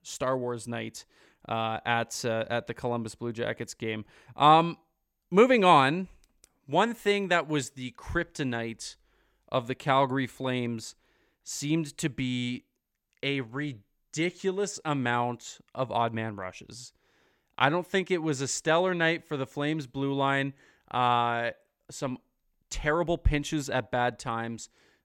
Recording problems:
none

